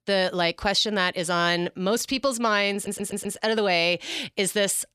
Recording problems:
audio stuttering; at 2.5 s

